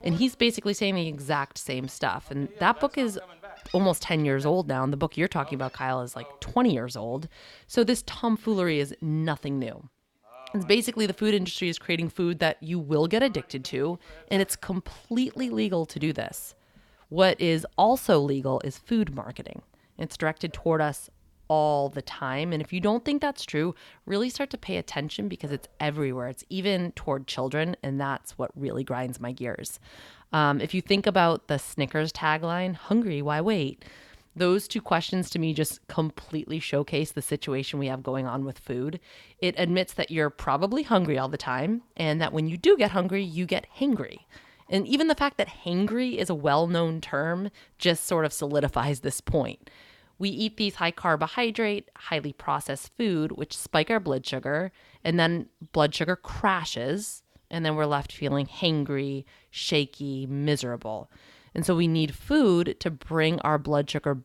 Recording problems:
animal sounds; faint; throughout; 25 dB below the speech

